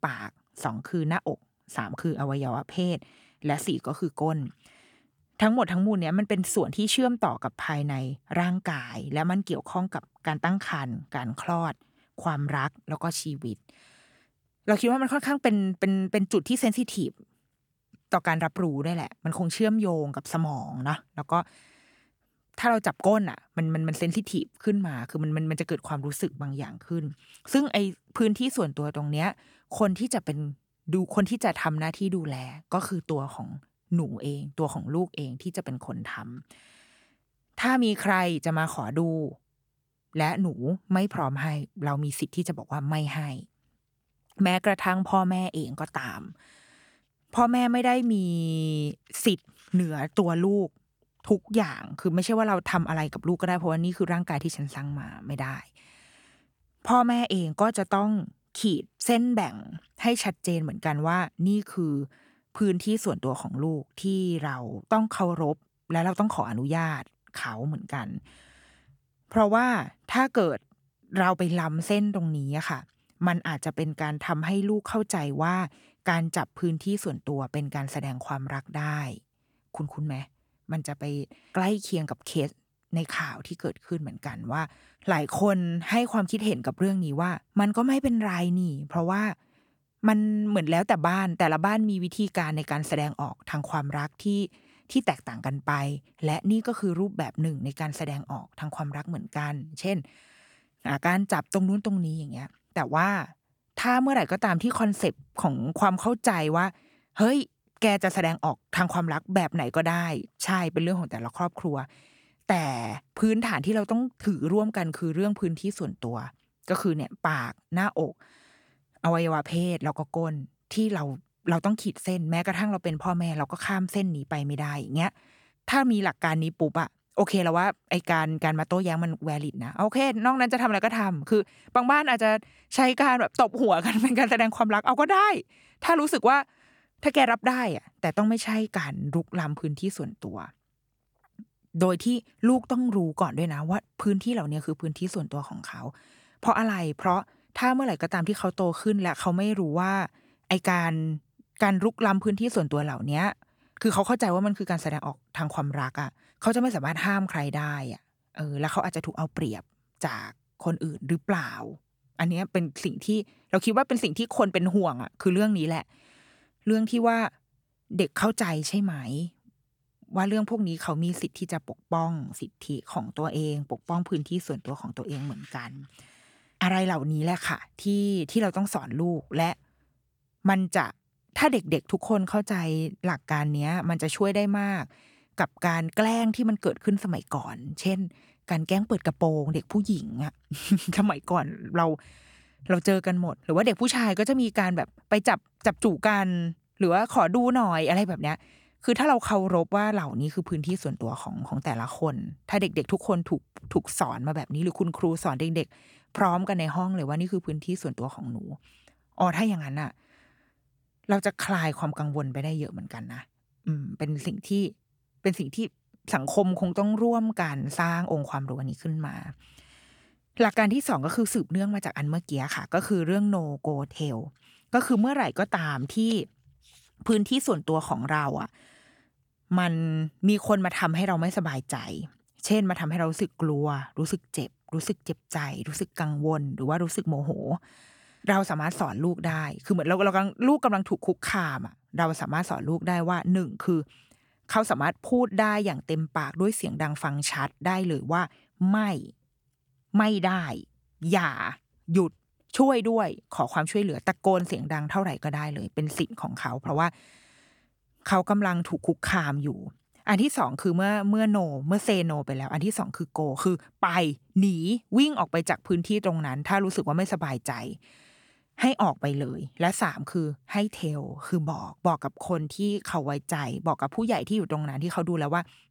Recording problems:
none

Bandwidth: 18.5 kHz